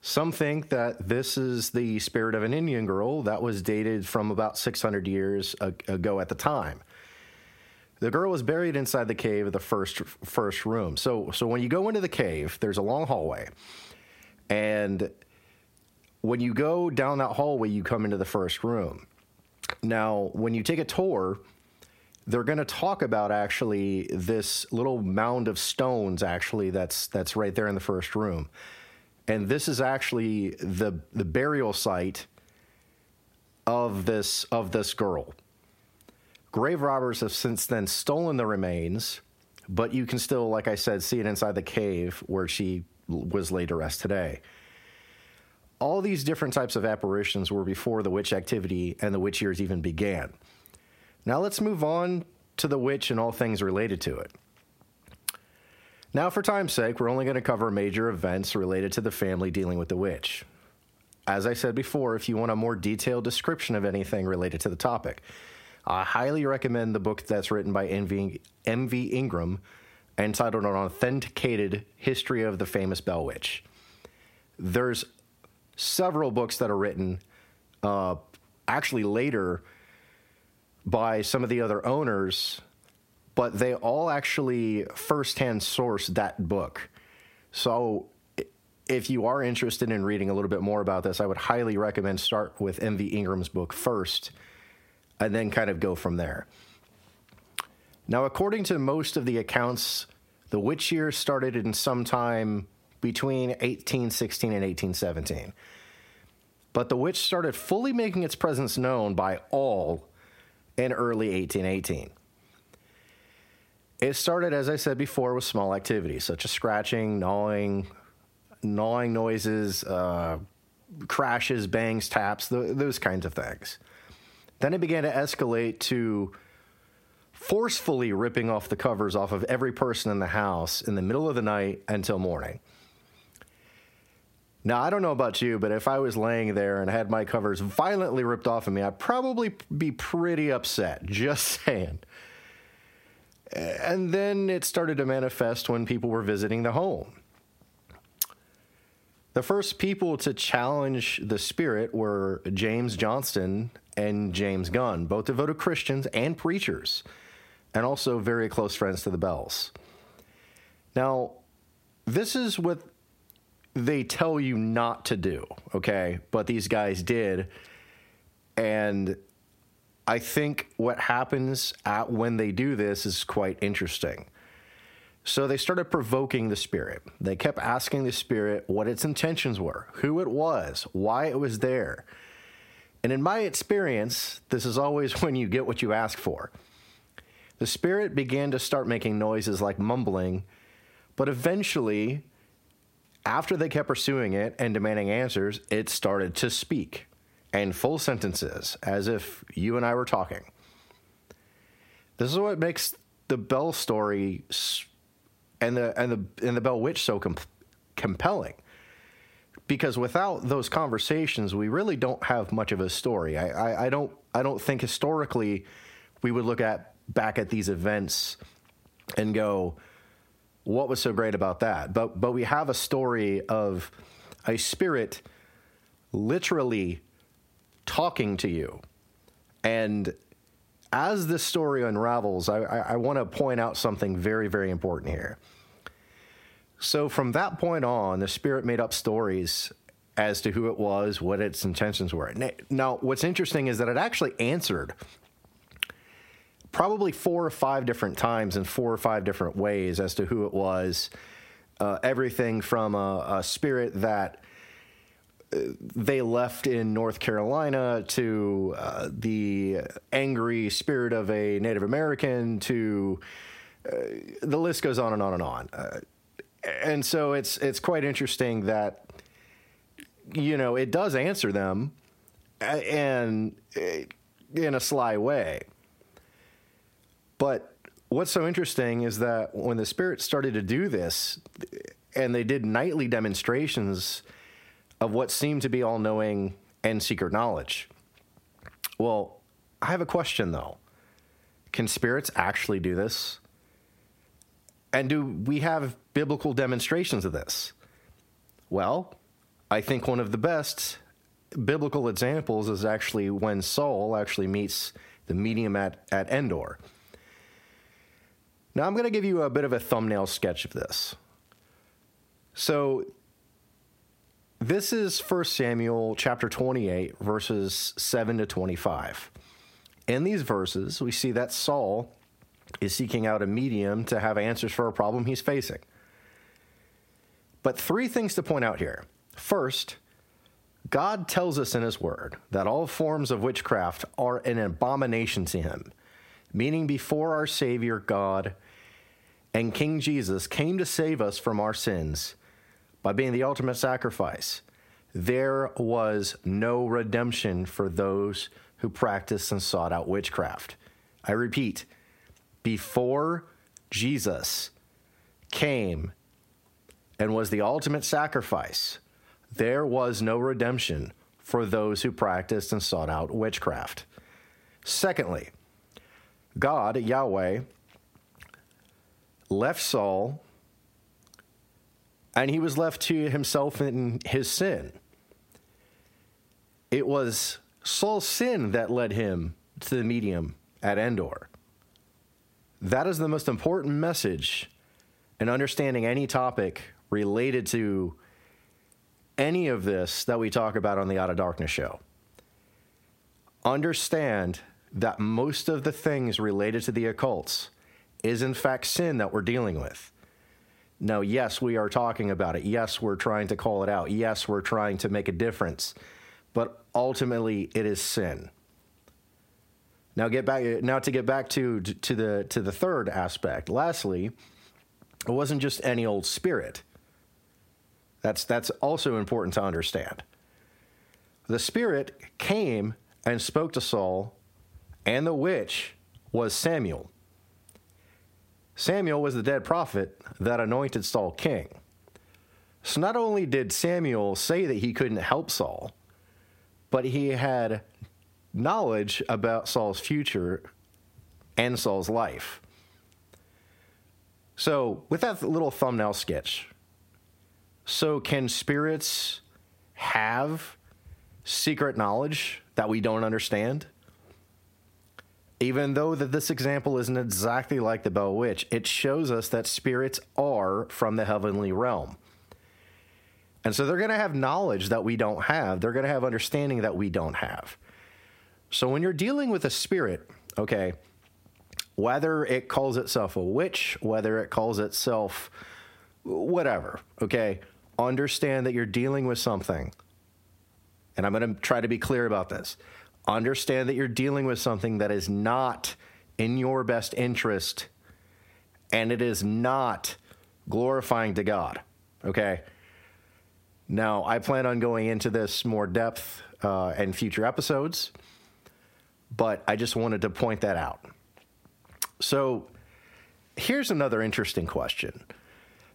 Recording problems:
squashed, flat; heavily

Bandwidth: 16 kHz